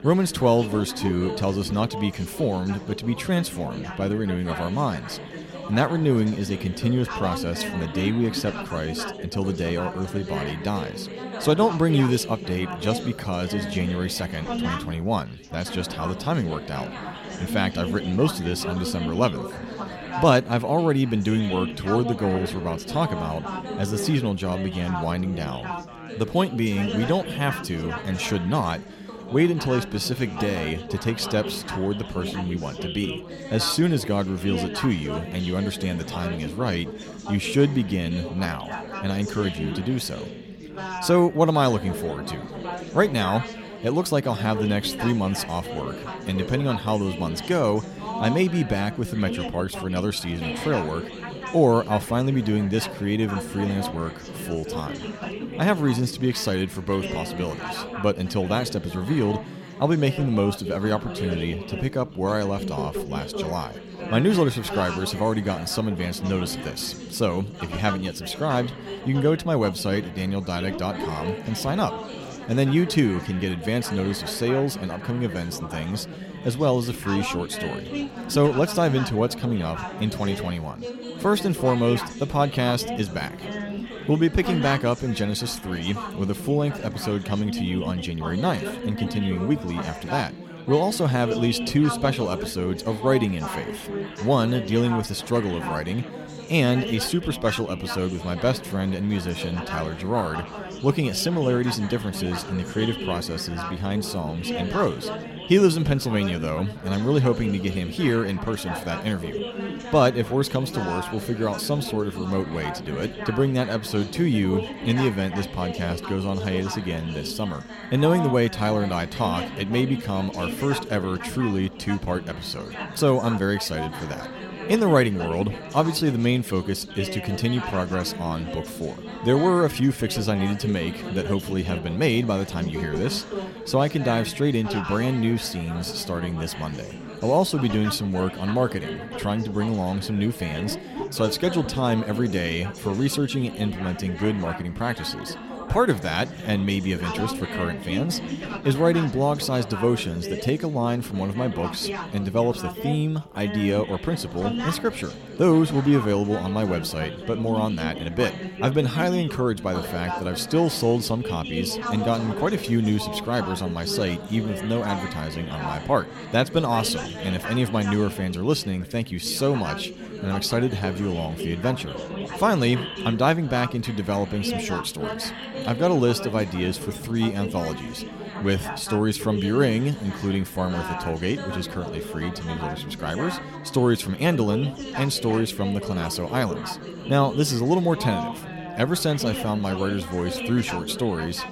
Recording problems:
chatter from many people; loud; throughout; 9 dB below the speech

